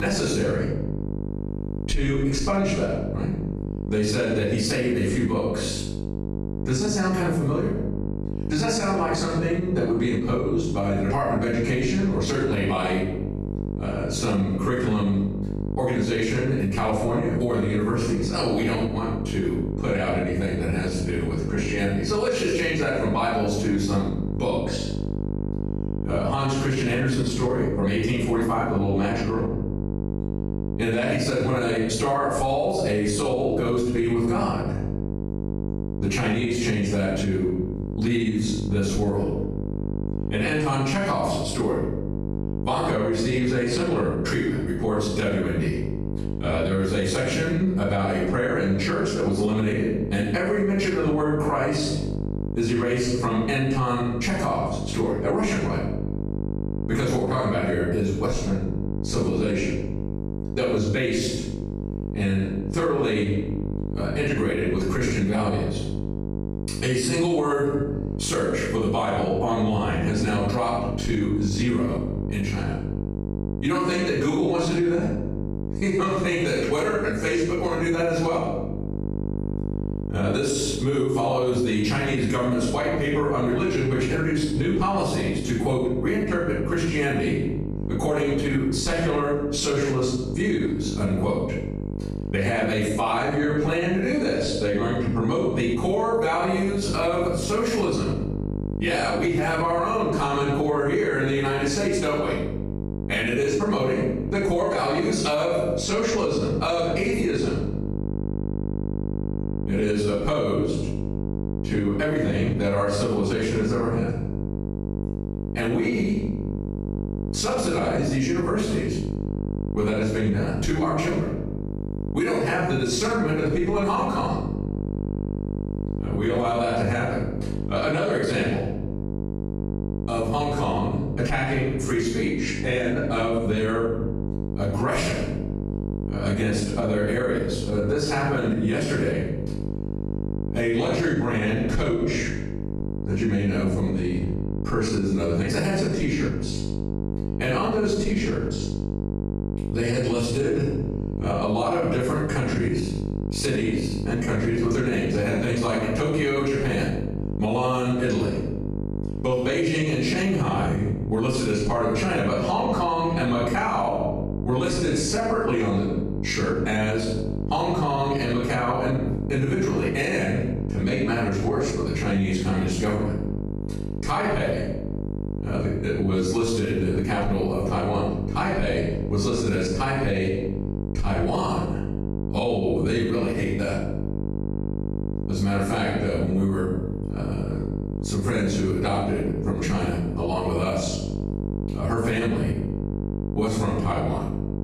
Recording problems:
off-mic speech; far
room echo; noticeable; dies away in 0.6 s
squashed, flat; somewhat
electrical hum; noticeable; throughout; 50 Hz, 15 dB below the speech
abrupt cut into speech; at the start

